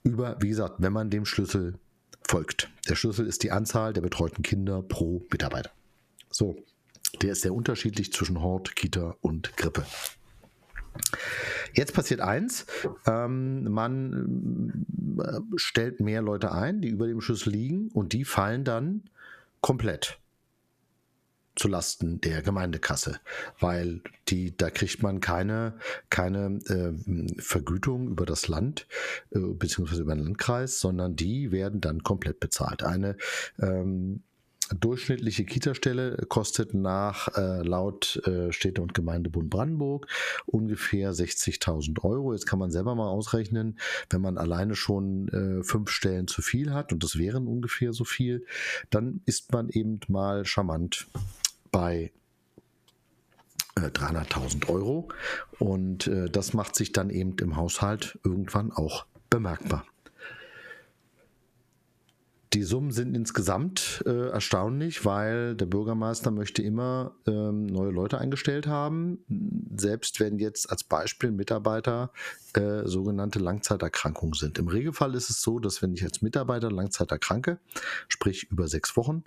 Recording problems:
squashed, flat; heavily

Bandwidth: 14.5 kHz